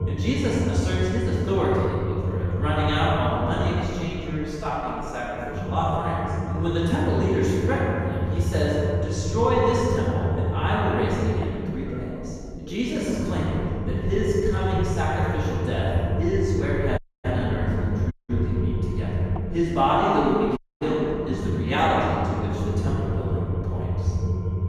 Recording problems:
room echo; strong; dies away in 2.2 s
off-mic speech; far
low rumble; noticeable; throughout; 10 dB below the speech
uneven, jittery; slightly; from 1.5 to 22 s
audio cutting out; at 17 s, at 18 s and at 21 s

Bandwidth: 14.5 kHz